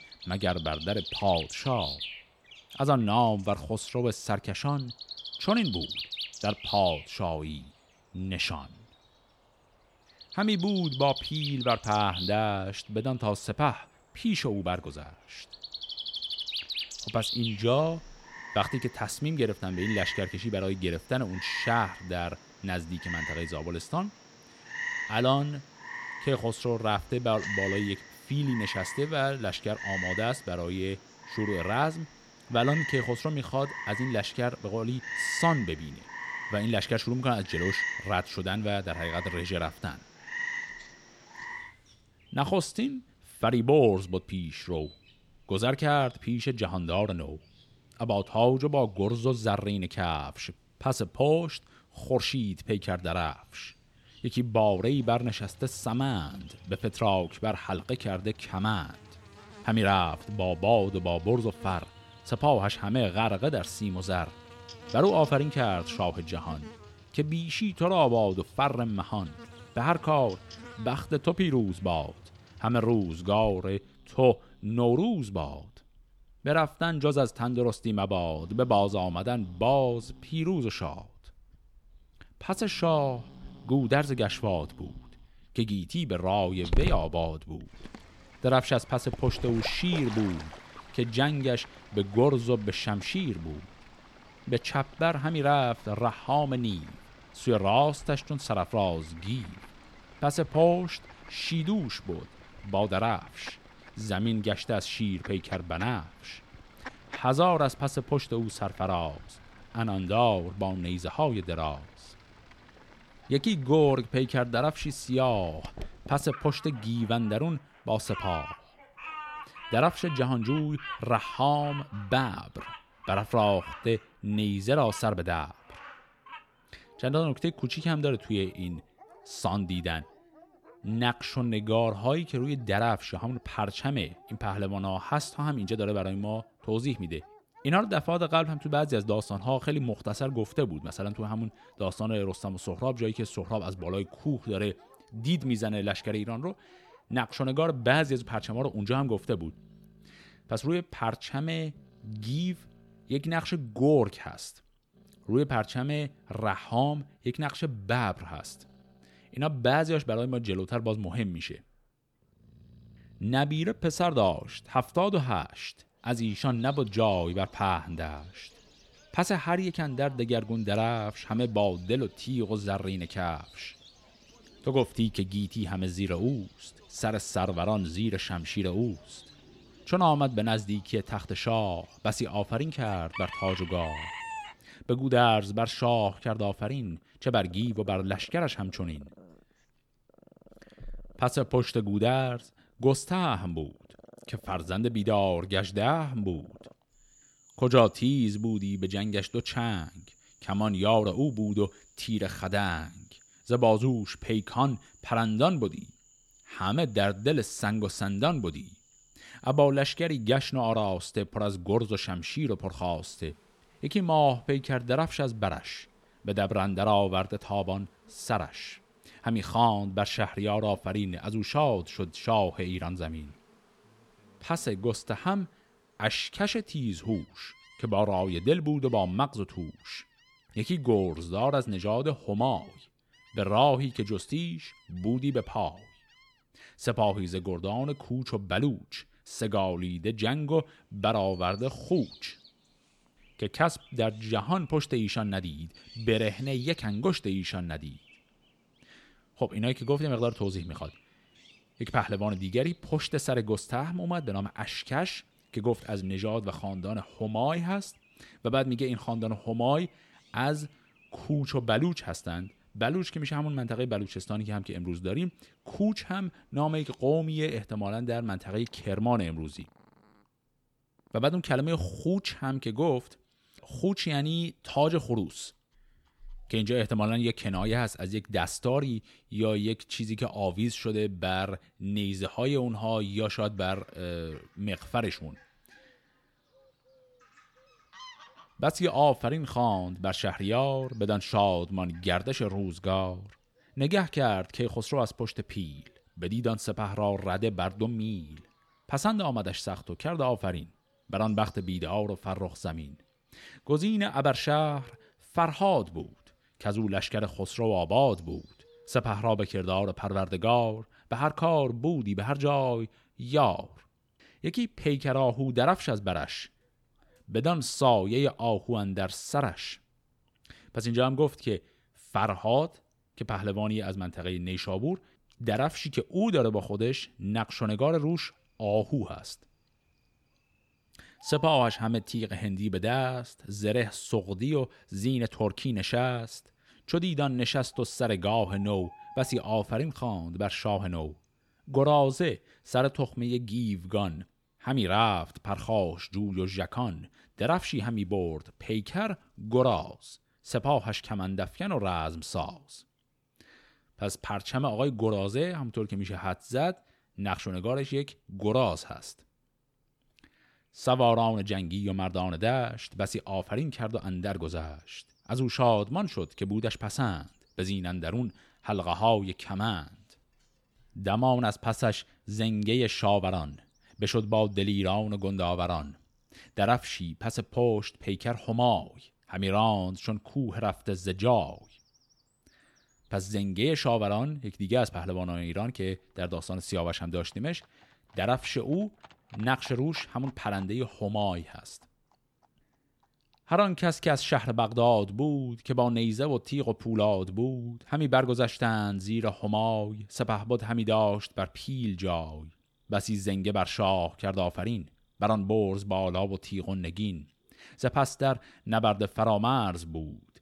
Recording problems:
animal sounds; noticeable; throughout; 15 dB below the speech

